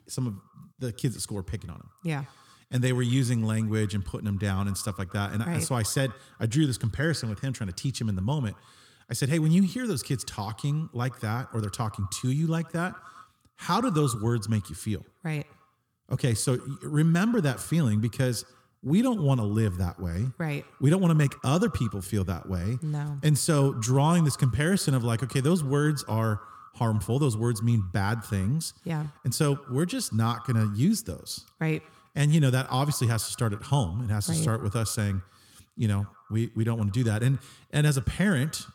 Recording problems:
echo of what is said; faint; throughout; 110 ms later, 20 dB below the speech

